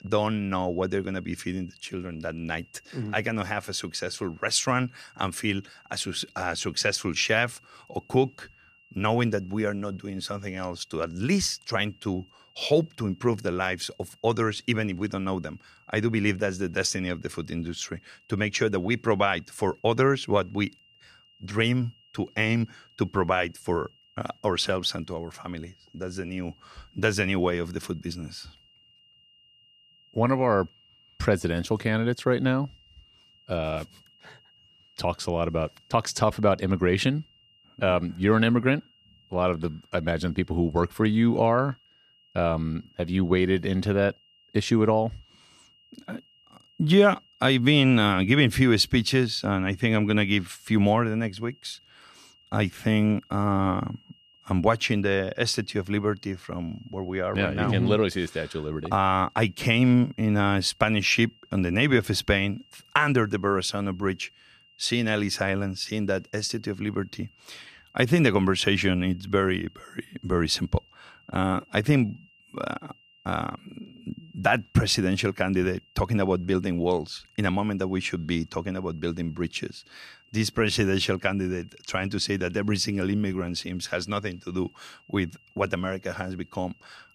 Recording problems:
high-pitched whine; faint; throughout; 3 kHz, 30 dB below the speech

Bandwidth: 14.5 kHz